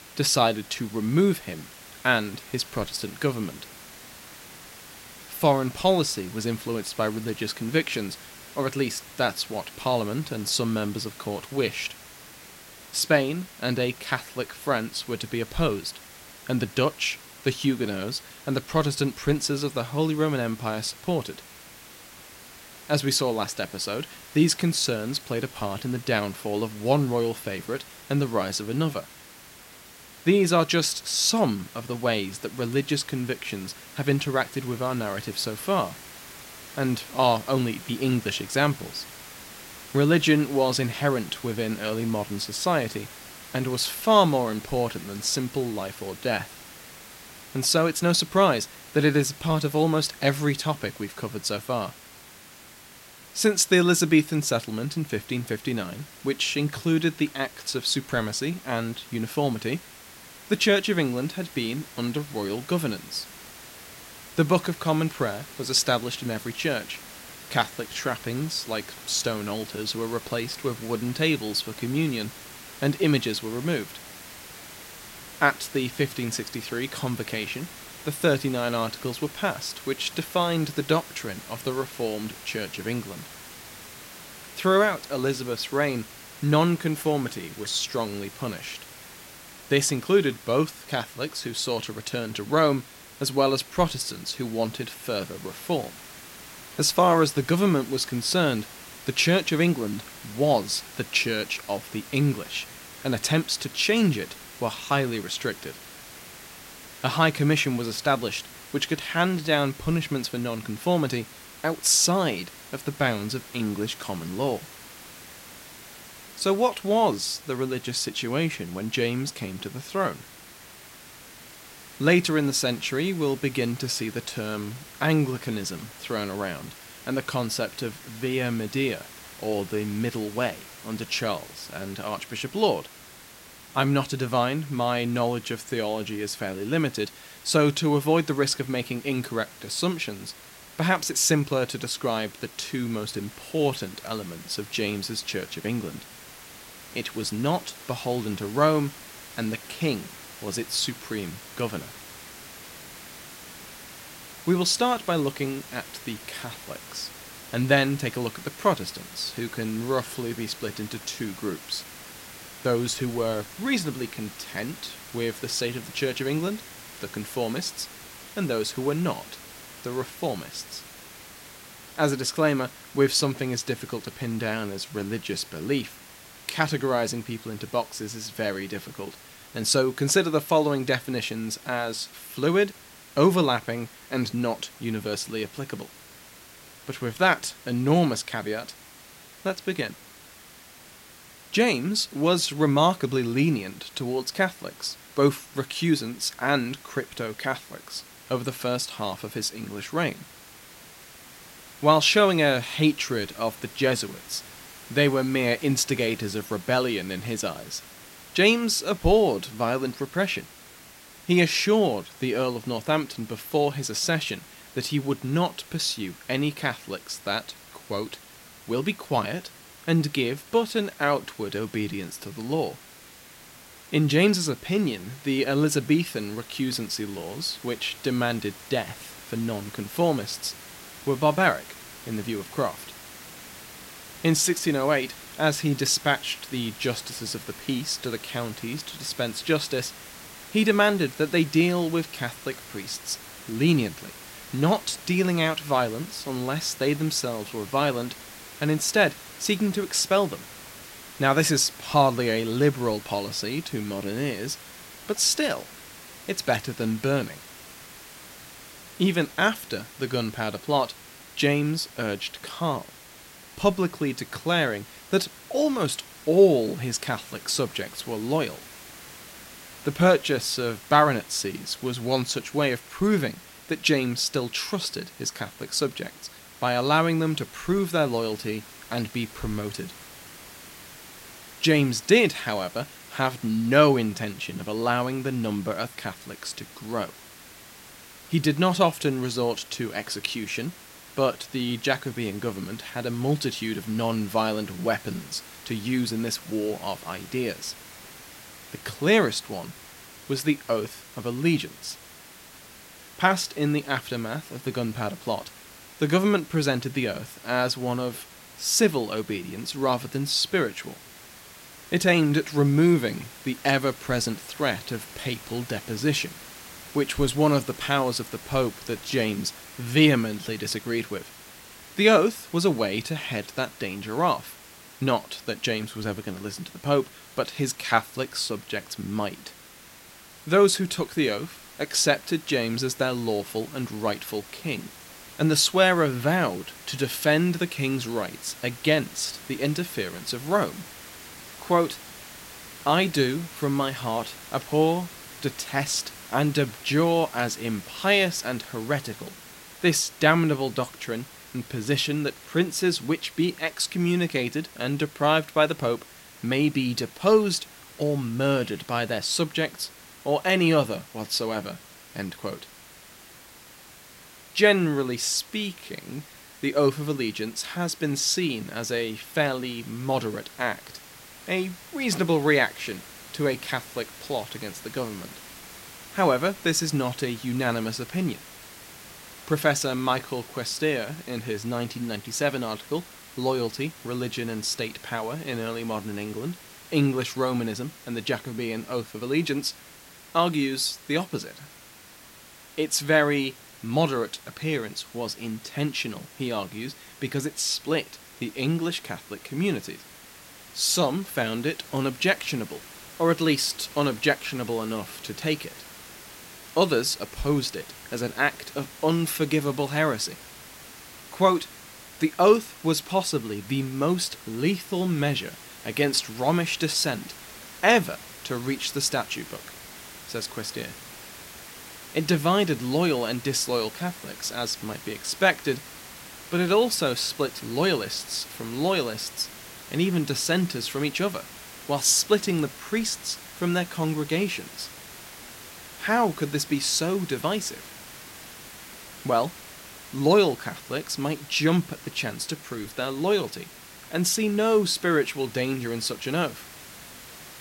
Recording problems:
hiss; noticeable; throughout; 15 dB below the speech

